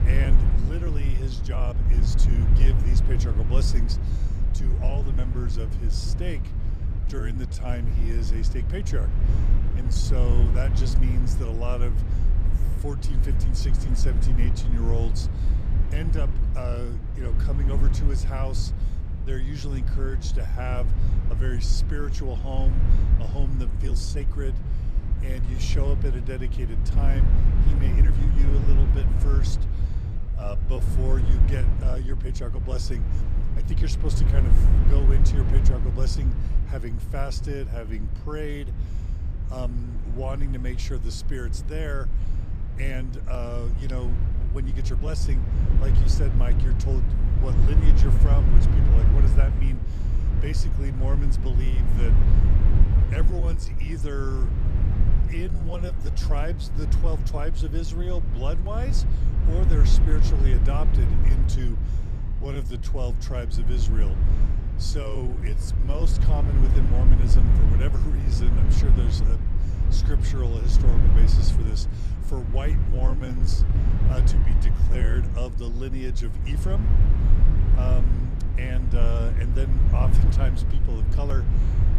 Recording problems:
low rumble; loud; throughout; 3 dB below the speech
uneven, jittery; strongly; from 1.5 s to 1:15

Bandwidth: 14.5 kHz